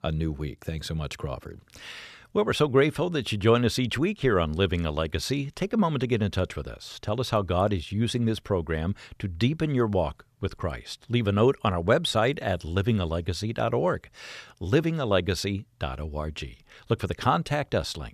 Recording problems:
none

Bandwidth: 14.5 kHz